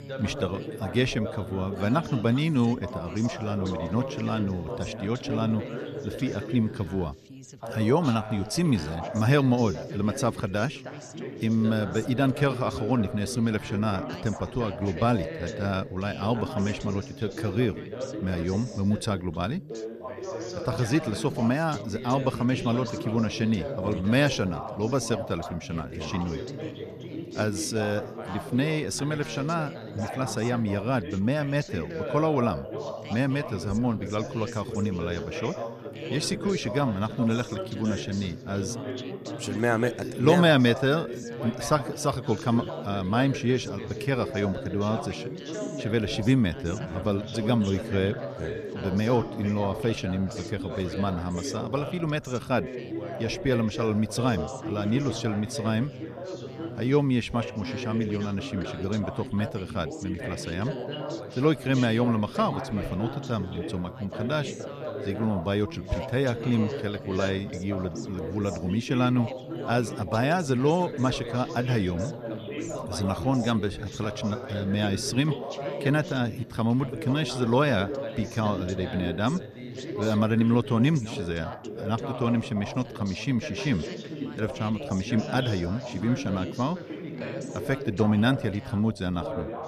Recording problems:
background chatter; loud; throughout; 3 voices, 8 dB below the speech

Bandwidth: 14 kHz